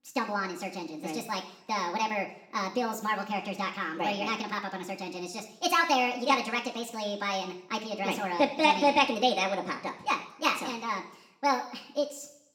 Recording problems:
wrong speed and pitch; too fast and too high; 1.5 times normal speed
room echo; slight; dies away in 0.6 s
off-mic speech; somewhat distant

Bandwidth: 17.5 kHz